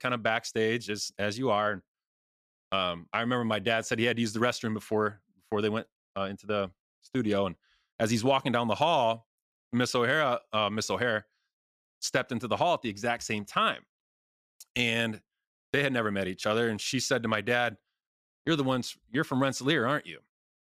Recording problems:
none

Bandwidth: 14.5 kHz